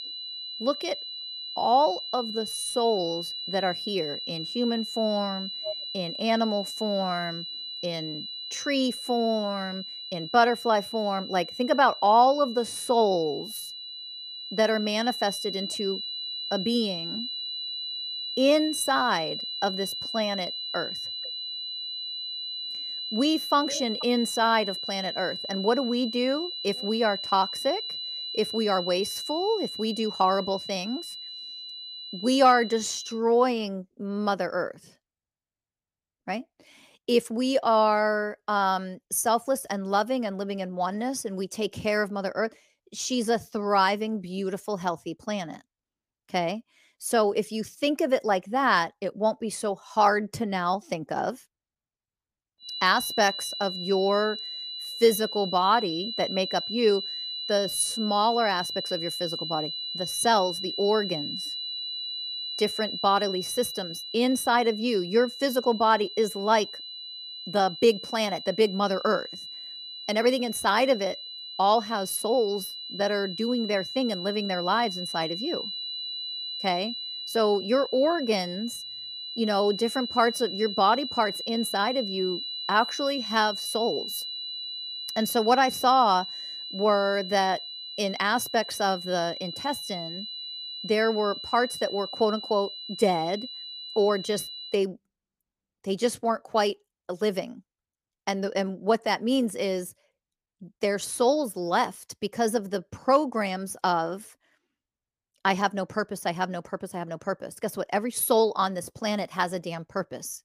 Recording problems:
high-pitched whine; loud; until 33 s and from 53 s to 1:35; 4 kHz, 7 dB below the speech

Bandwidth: 15 kHz